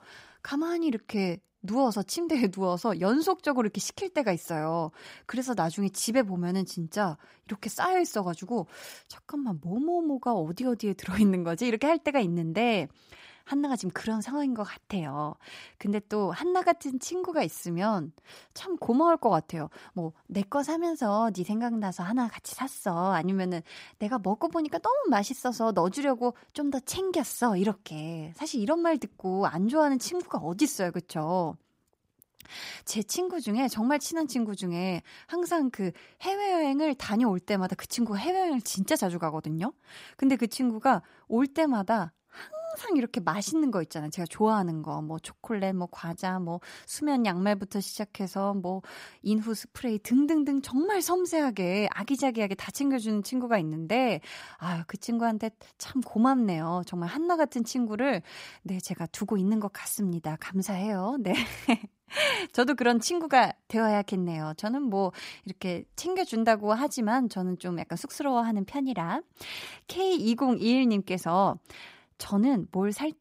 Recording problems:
none

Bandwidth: 15.5 kHz